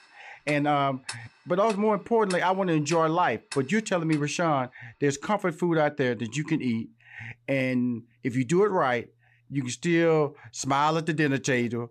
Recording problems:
household noises; noticeable; throughout; 15 dB below the speech

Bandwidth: 14 kHz